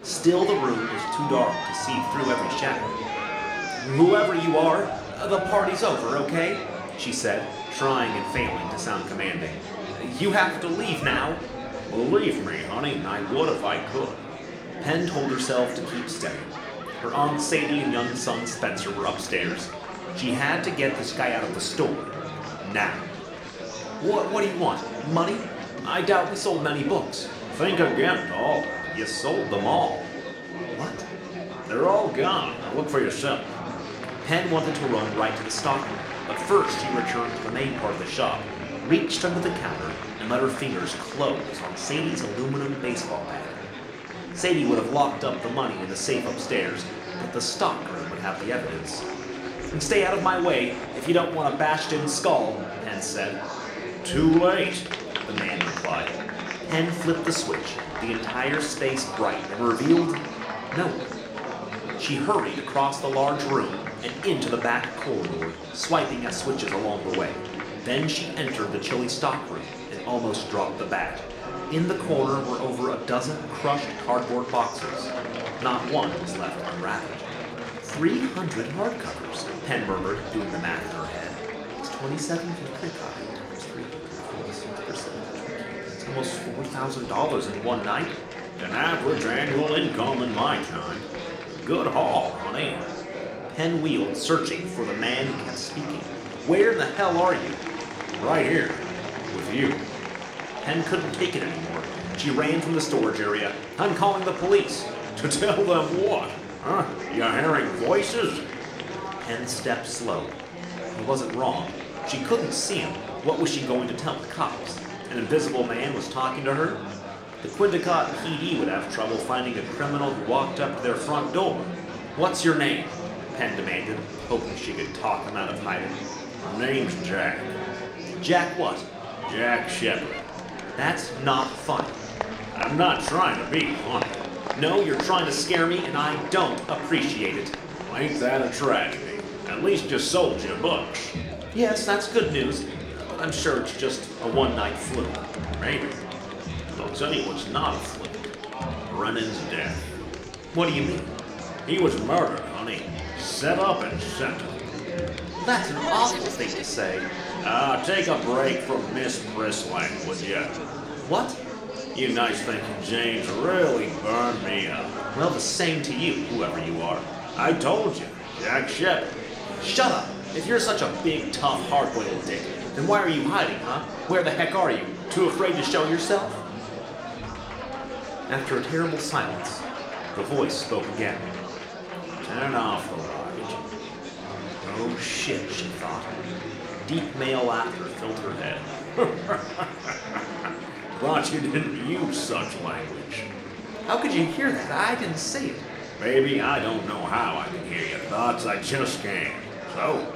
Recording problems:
room echo; slight; dies away in 0.5 s
off-mic speech; somewhat distant
murmuring crowd; loud; throughout; 8 dB below the speech
background music; faint; throughout; 20 dB below the speech

